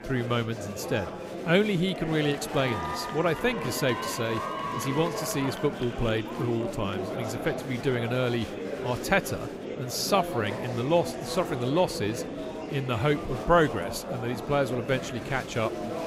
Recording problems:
murmuring crowd; loud; throughout; 6 dB below the speech

